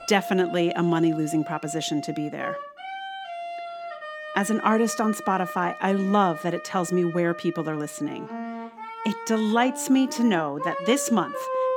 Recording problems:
background music; noticeable; throughout; 10 dB below the speech

